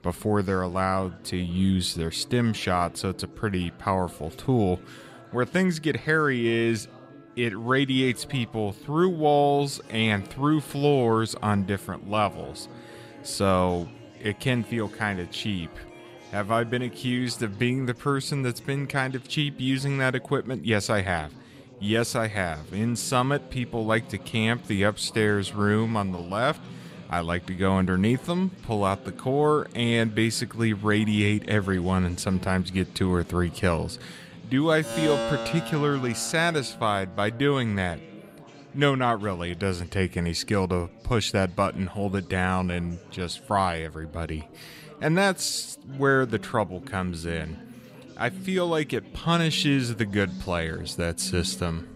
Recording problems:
background music; noticeable; throughout; 15 dB below the speech
chatter from many people; faint; throughout; 20 dB below the speech

